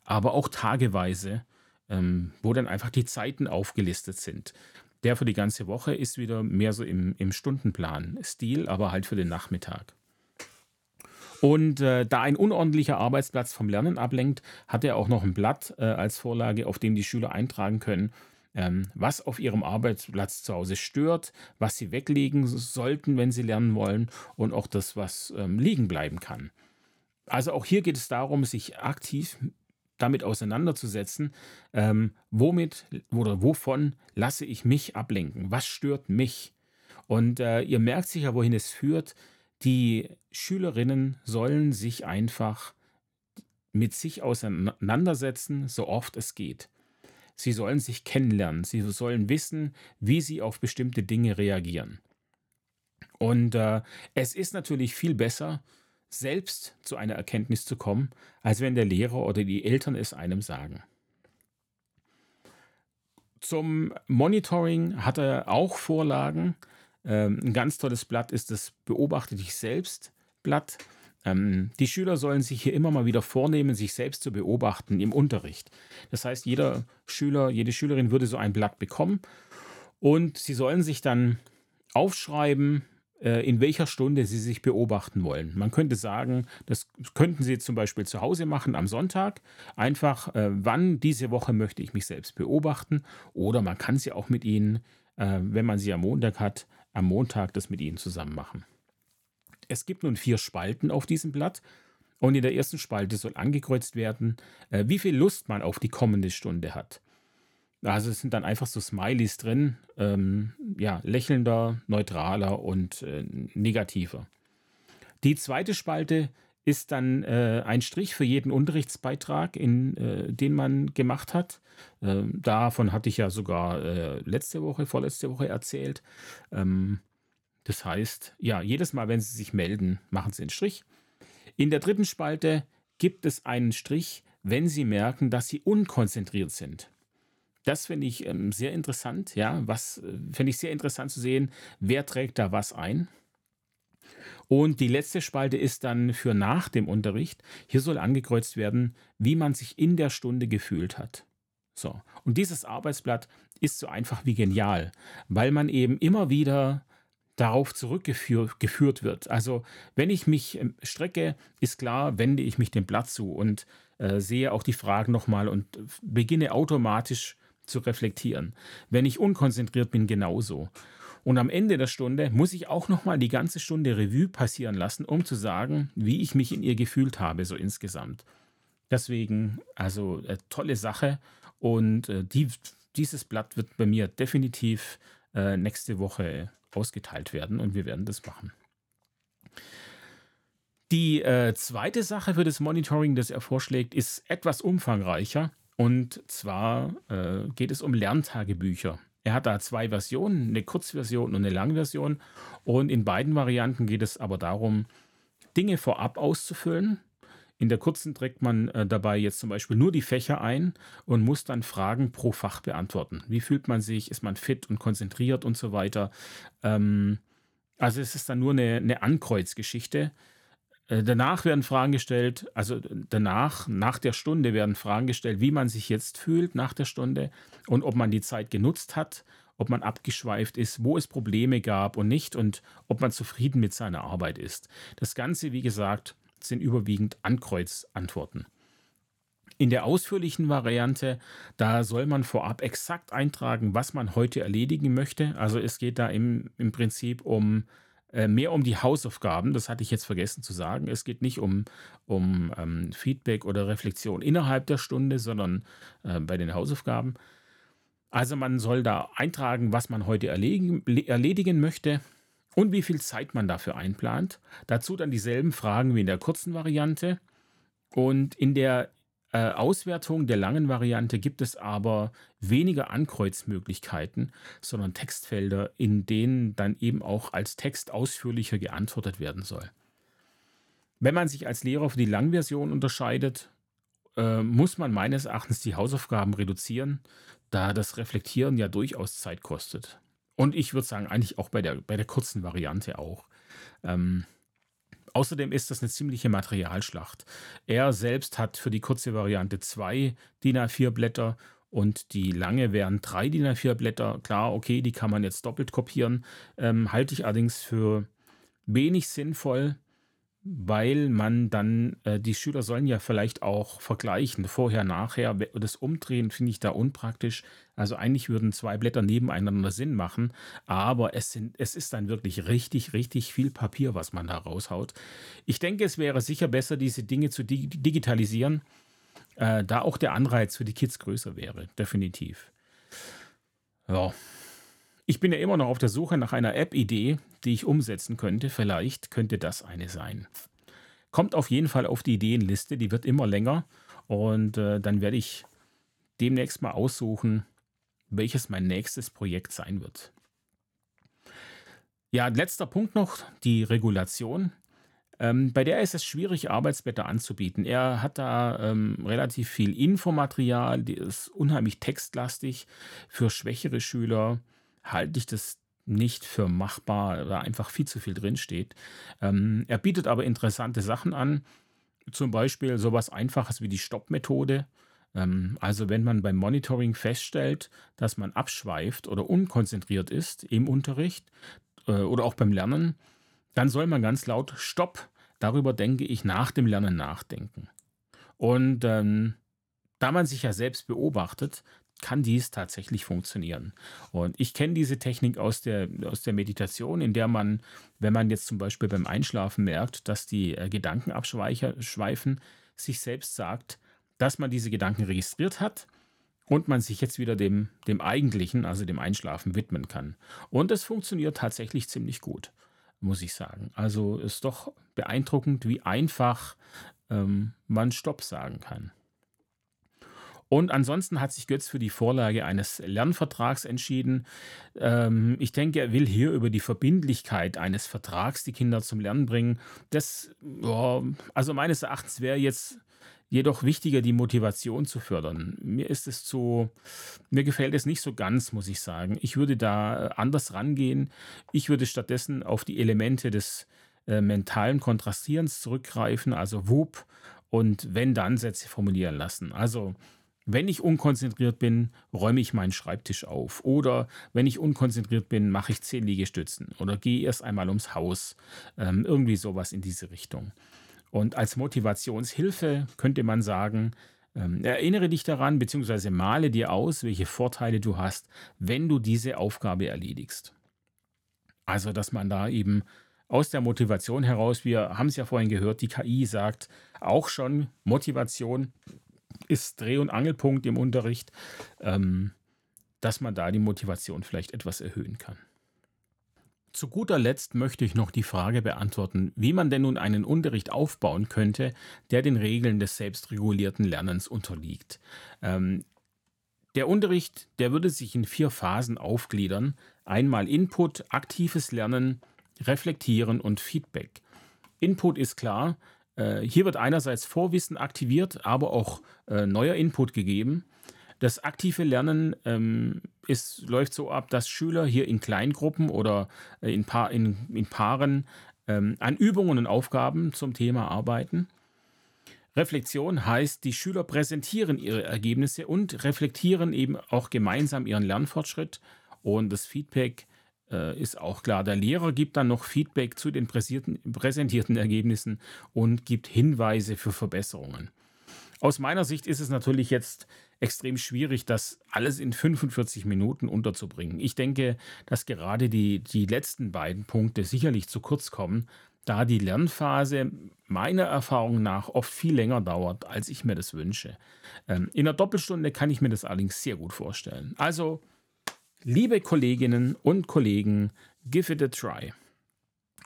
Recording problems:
none

